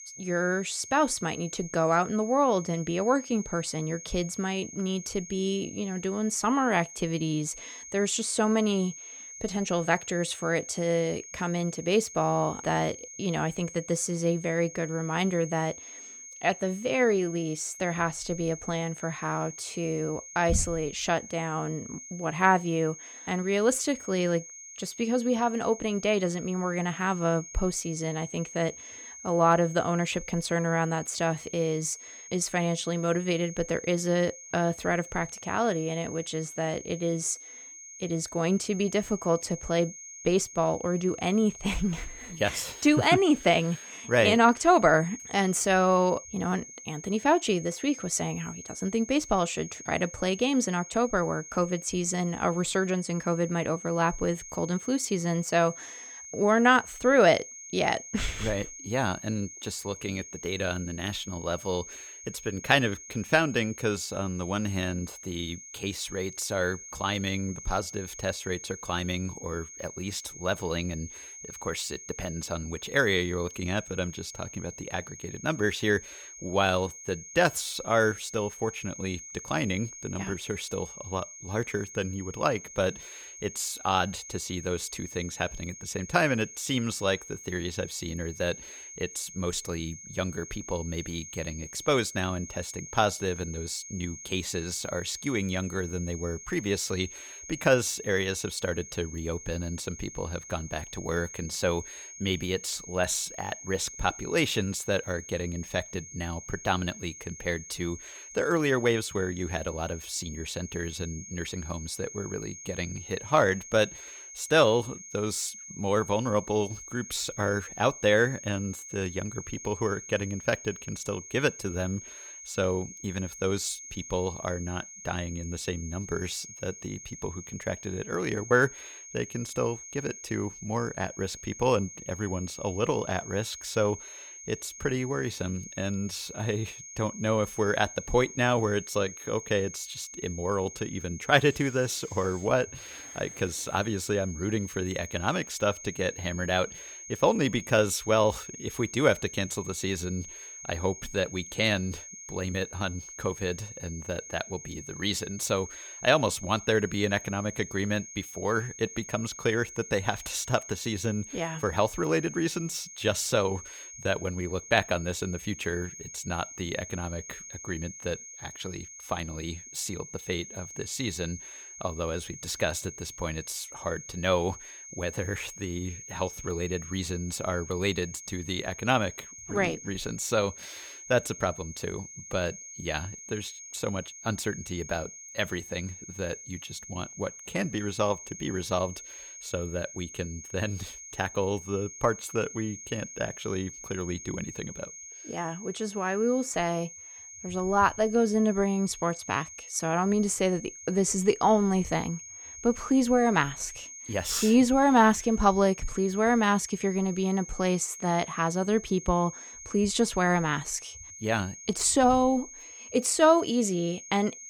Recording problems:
high-pitched whine; noticeable; throughout; 6.5 kHz, 15 dB below the speech

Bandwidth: 19 kHz